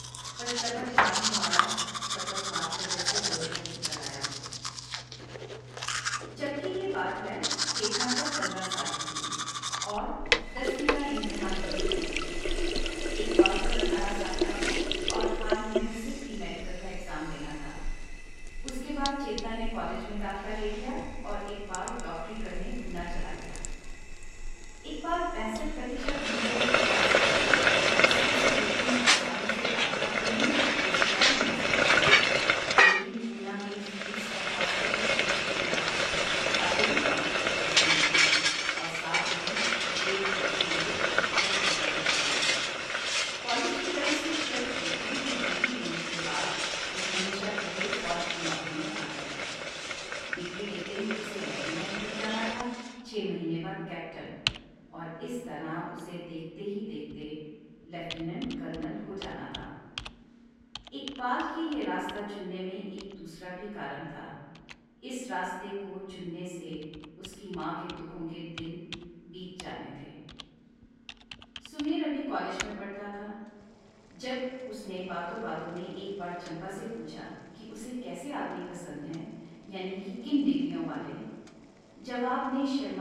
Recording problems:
room echo; strong; dies away in 1.3 s
off-mic speech; far
household noises; very loud; throughout; 10 dB above the speech
abrupt cut into speech; at the end

